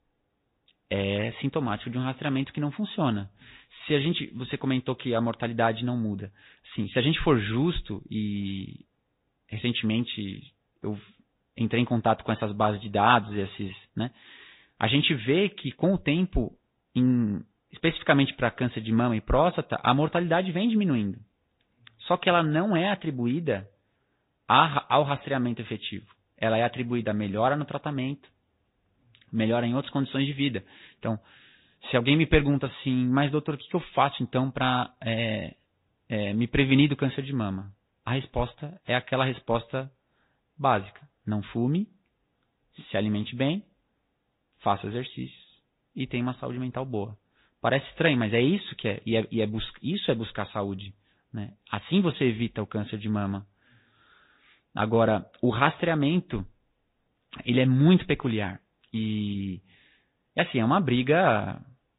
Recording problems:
high frequencies cut off; severe; nothing above 4 kHz
garbled, watery; slightly

